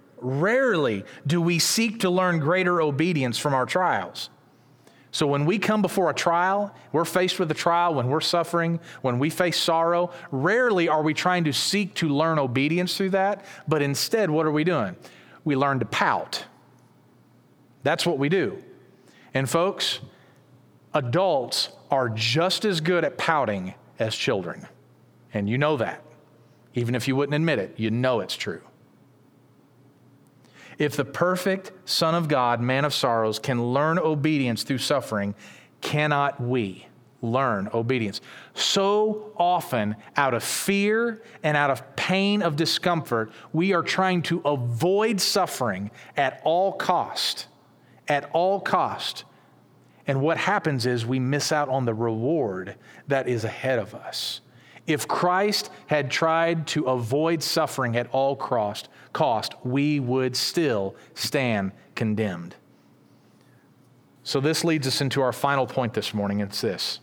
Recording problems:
squashed, flat; heavily

